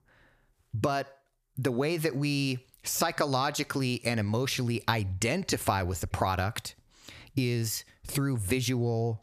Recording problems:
squashed, flat; heavily

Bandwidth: 14.5 kHz